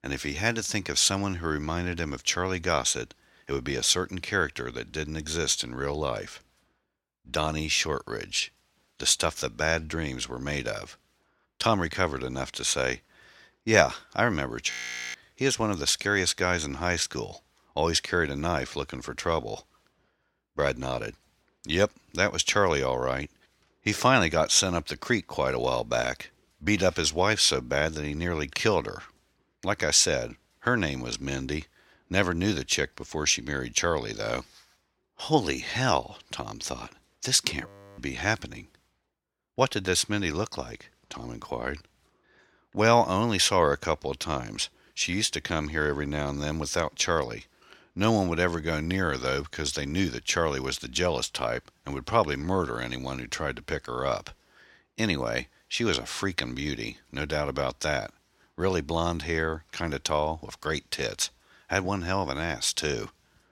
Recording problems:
audio freezing; at 15 s and at 38 s

